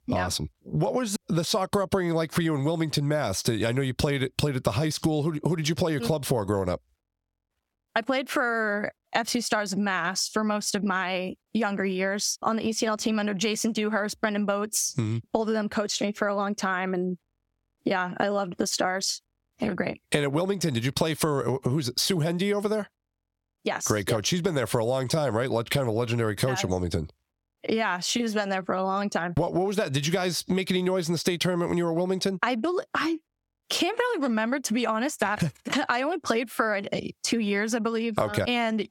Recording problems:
squashed, flat; heavily

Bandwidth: 17 kHz